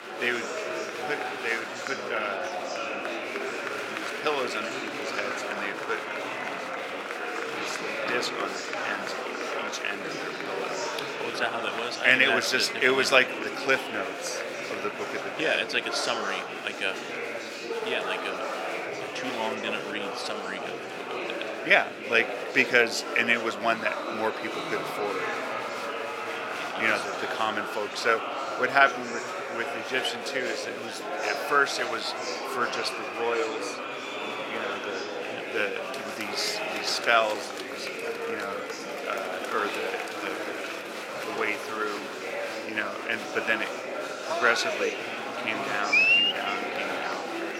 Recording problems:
thin; somewhat; fading below 400 Hz
murmuring crowd; loud; throughout; 3 dB below the speech

